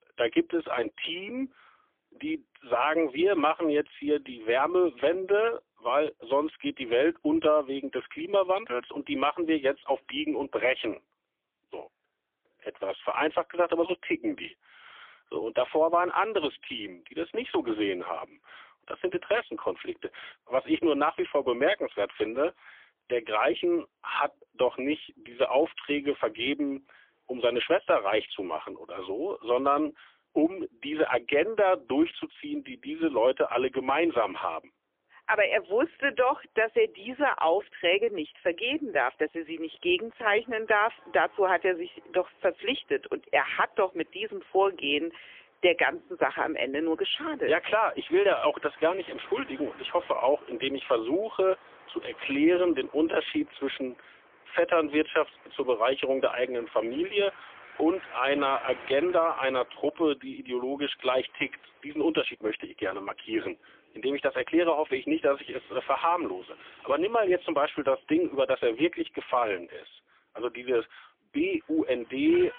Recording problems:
phone-call audio; poor line; nothing above 3.5 kHz
traffic noise; faint; throughout; 25 dB below the speech

